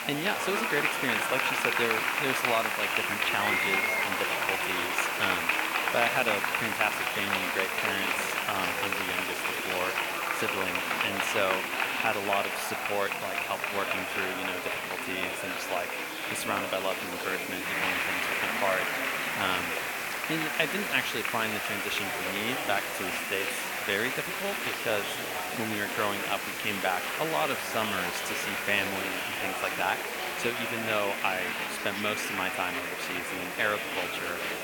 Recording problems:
thin; somewhat; fading below 700 Hz
murmuring crowd; very loud; throughout; 3 dB above the speech
hiss; loud; throughout; 6 dB below the speech
animal sounds; noticeable; throughout; 20 dB below the speech

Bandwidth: 17.5 kHz